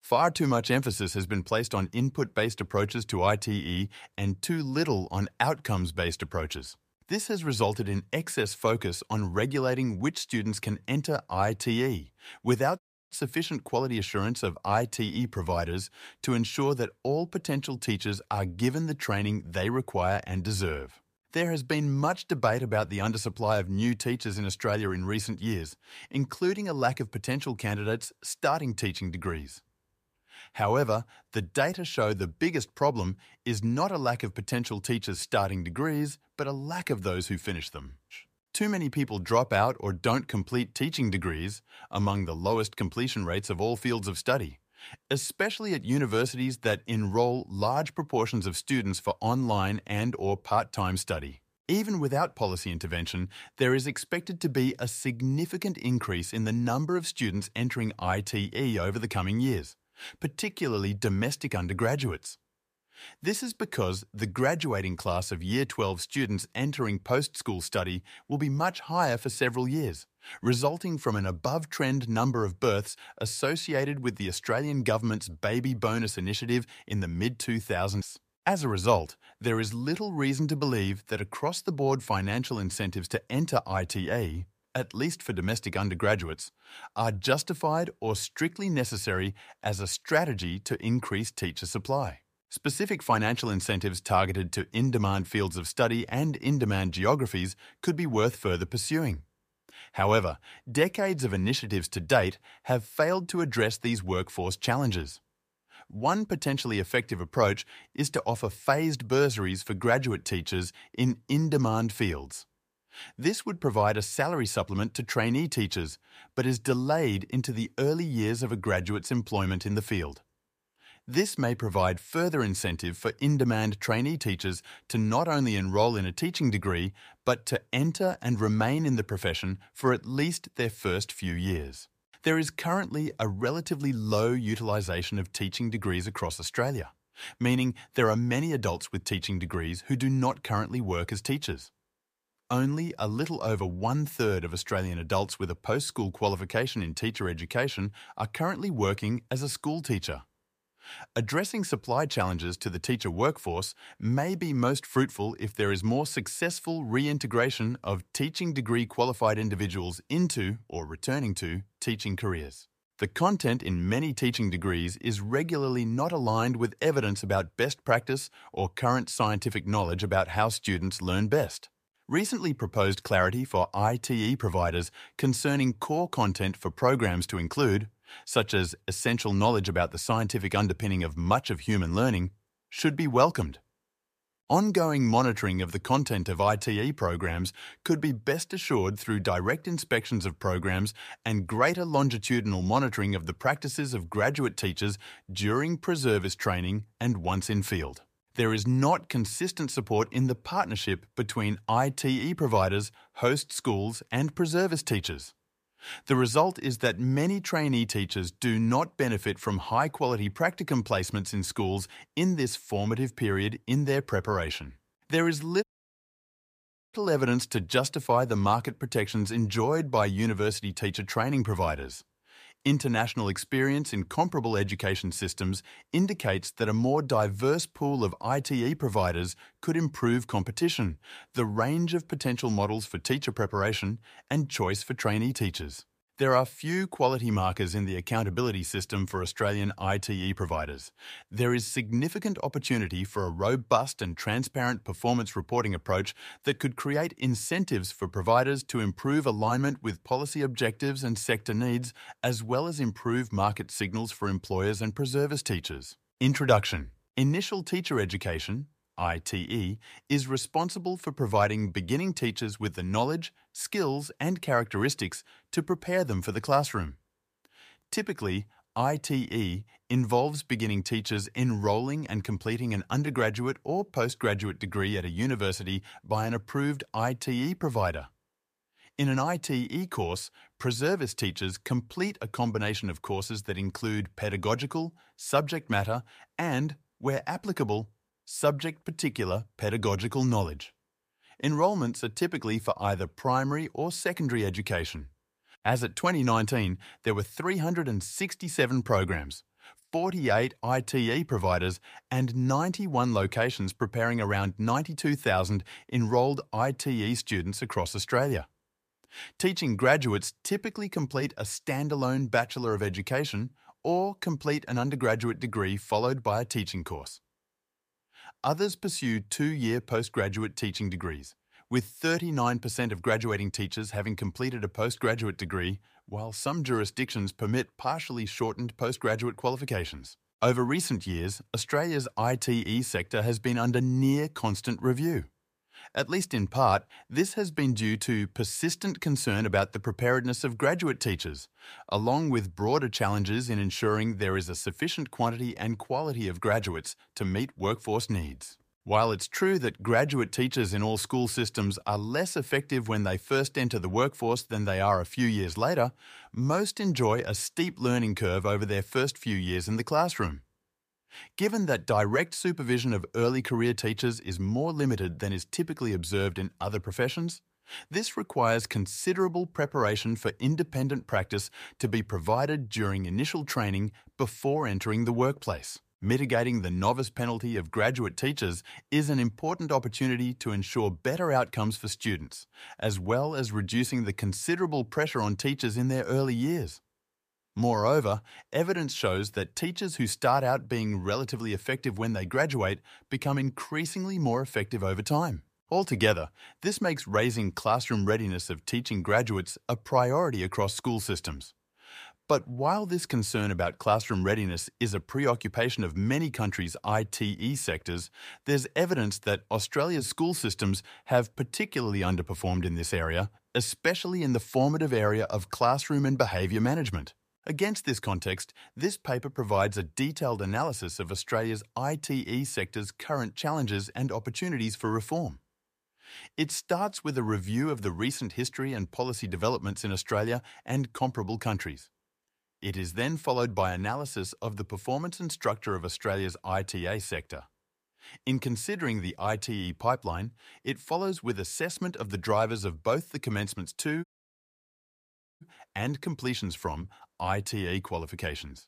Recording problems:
audio cutting out; at 13 s, at 3:36 for 1.5 s and at 7:24 for 1.5 s

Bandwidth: 15 kHz